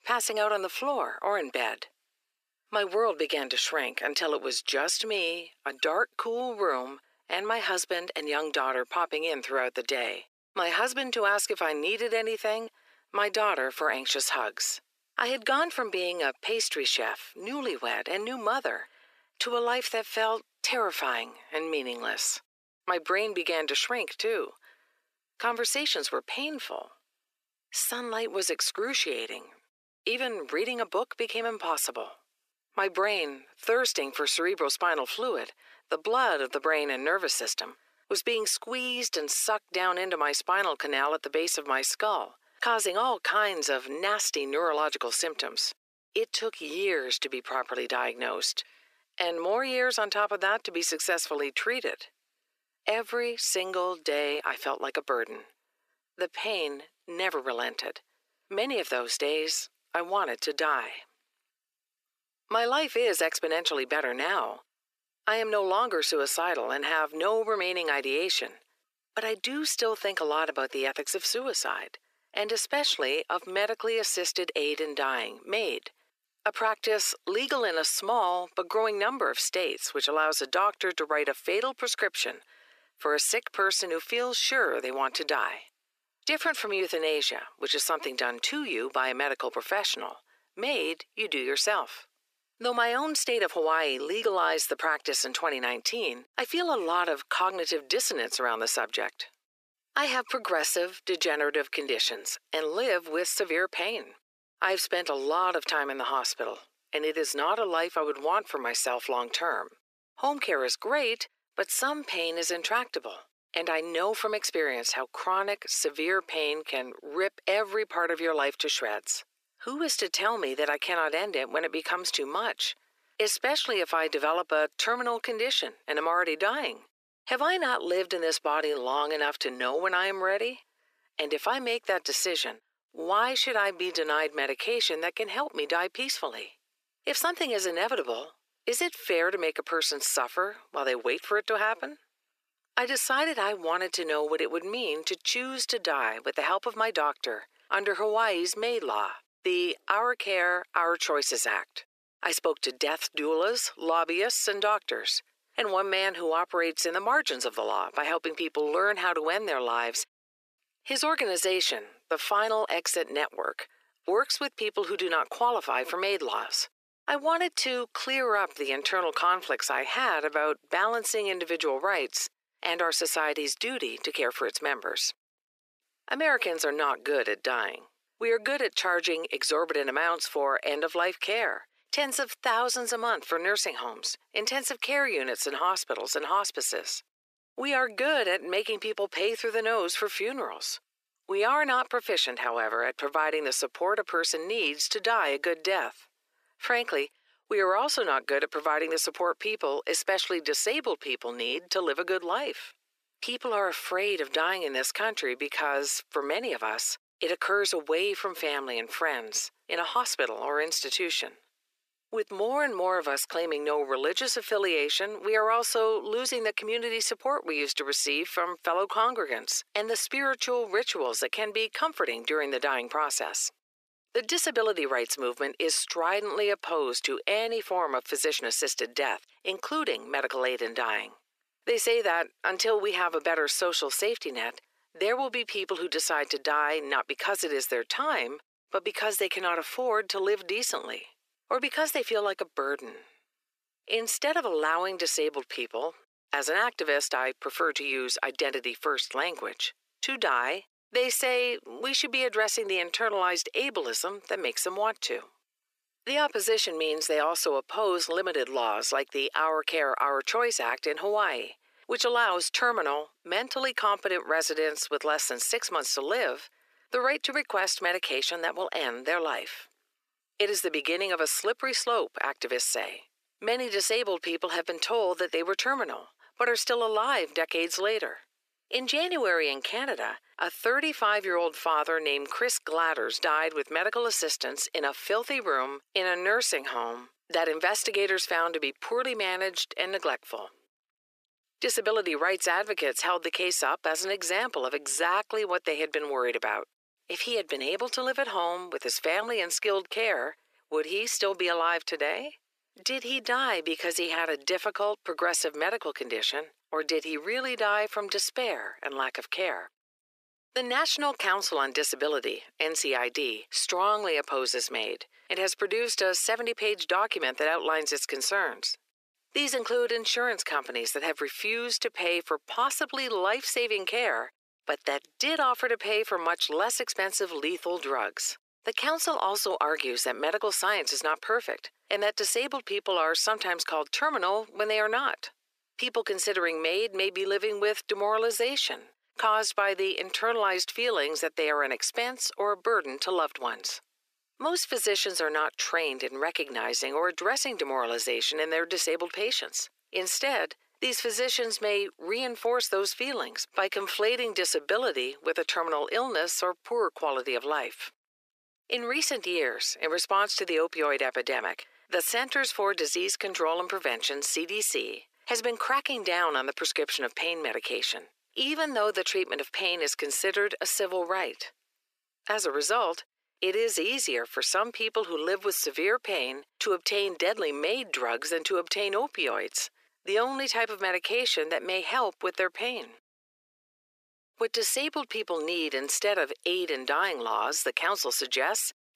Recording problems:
thin; very; fading below 350 Hz

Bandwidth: 14.5 kHz